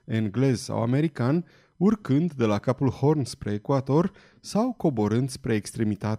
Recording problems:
none

